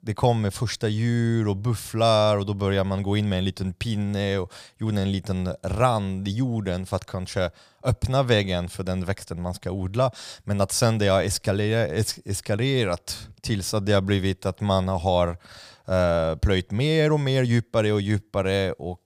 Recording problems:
none

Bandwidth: 15 kHz